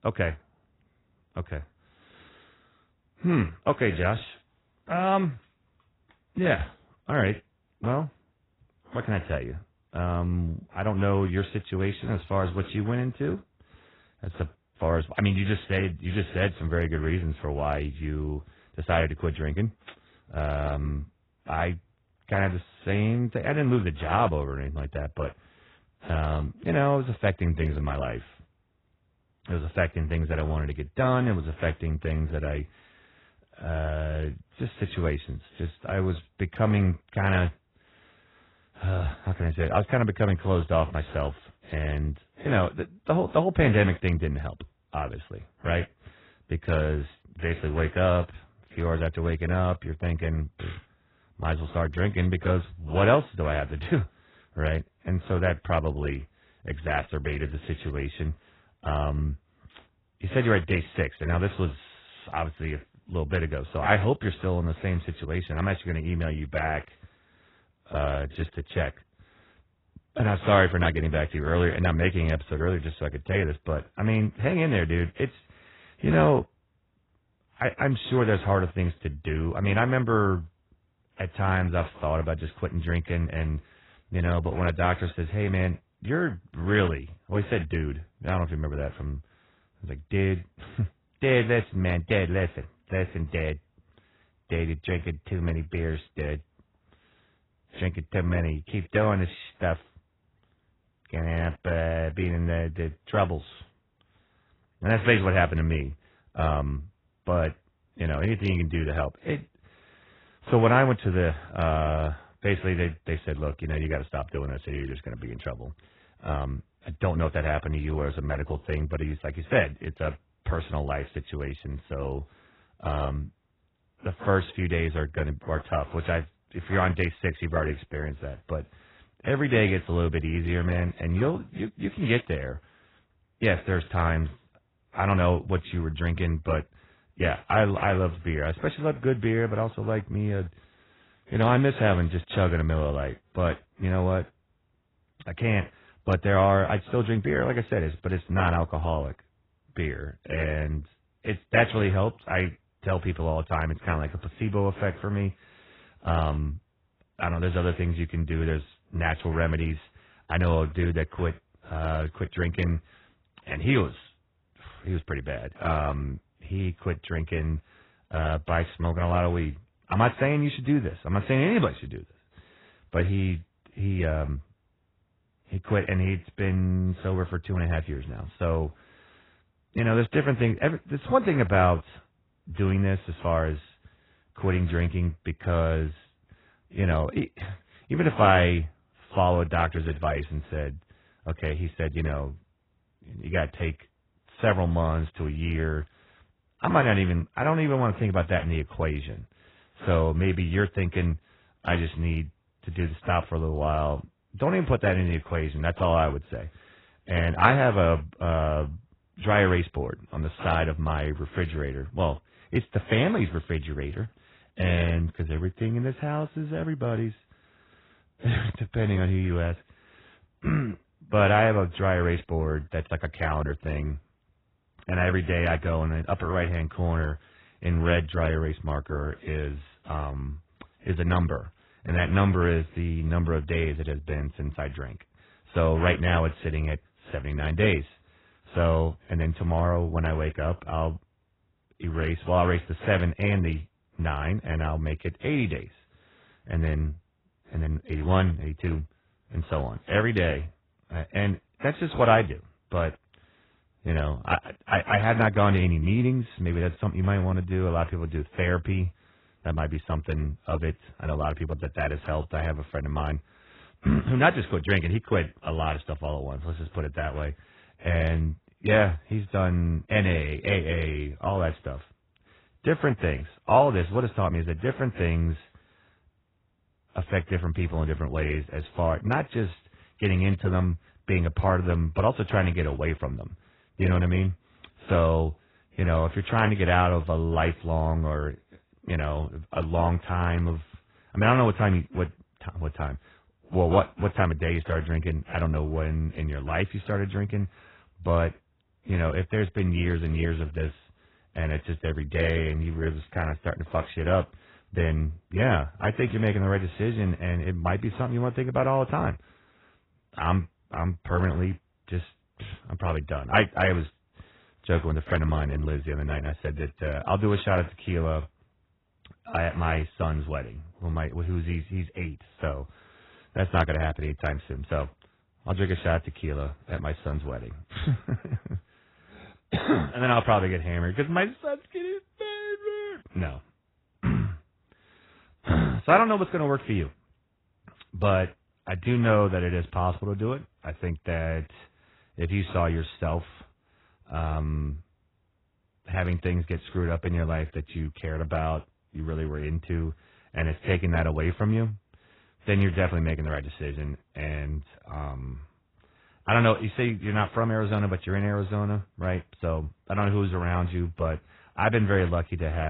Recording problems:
garbled, watery; badly
abrupt cut into speech; at the end

